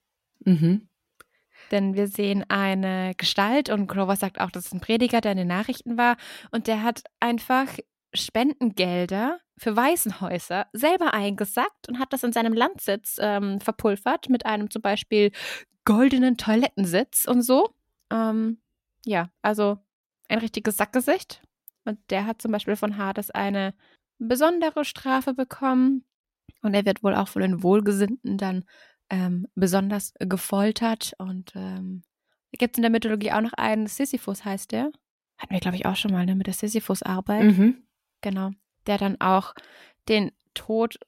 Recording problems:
none

